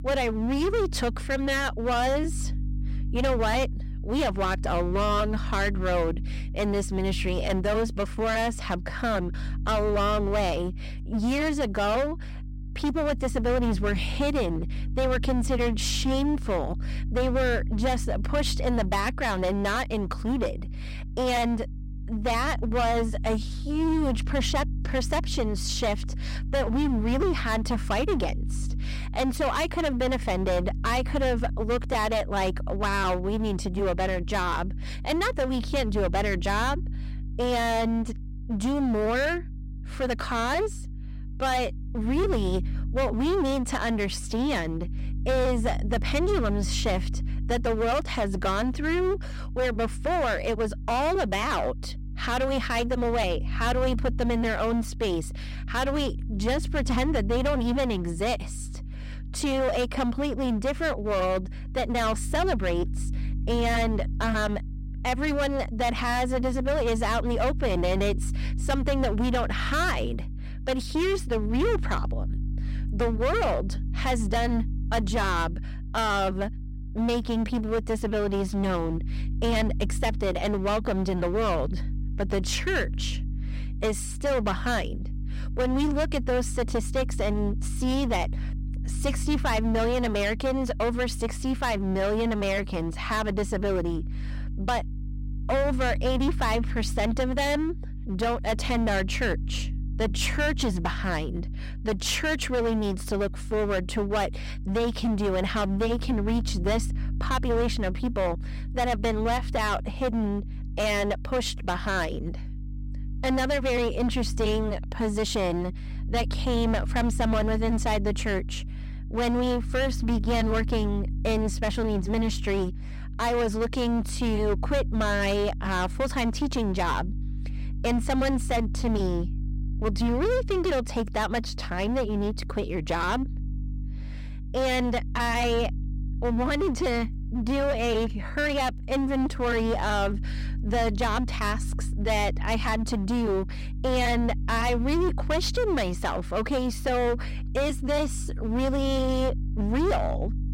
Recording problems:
distortion; heavy; 18% of the sound clipped
electrical hum; faint; throughout; 50 Hz, 20 dB below the speech

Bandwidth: 16 kHz